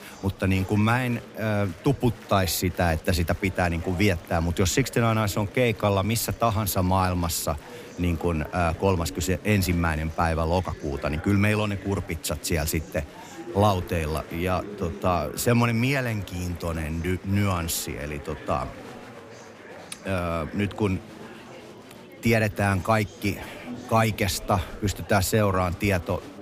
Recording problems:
murmuring crowd; noticeable; throughout; 15 dB below the speech

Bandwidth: 15 kHz